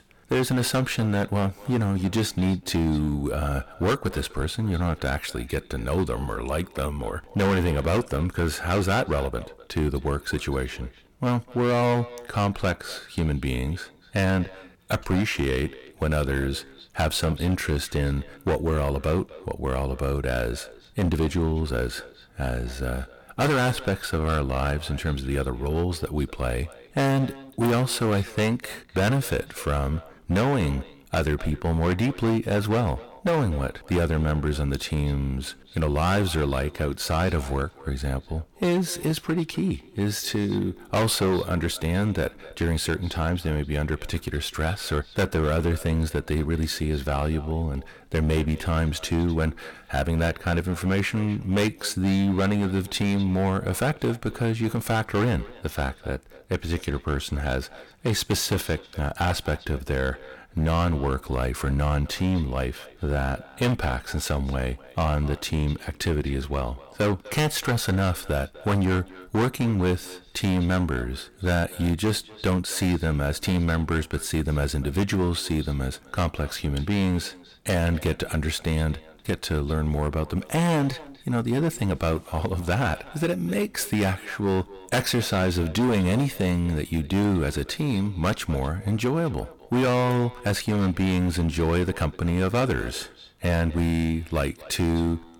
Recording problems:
distortion; heavy; 11% of the sound clipped
echo of what is said; faint; throughout; 250 ms later, 20 dB below the speech

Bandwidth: 17.5 kHz